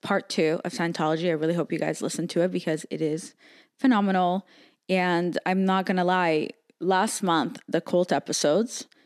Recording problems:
none

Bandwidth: 13.5 kHz